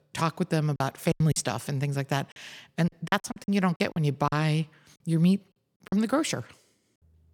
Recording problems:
choppy; very; 11% of the speech affected

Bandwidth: 18 kHz